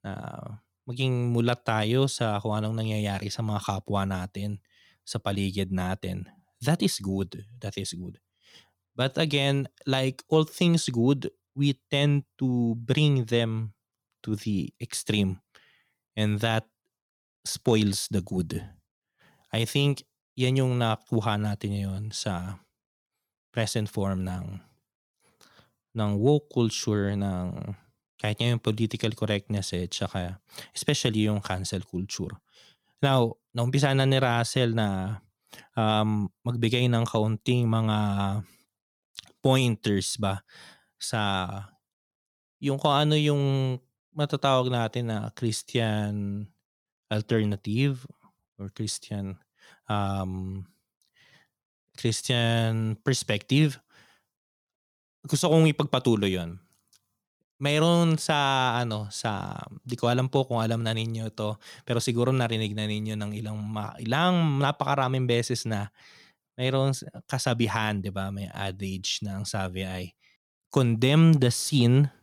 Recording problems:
none

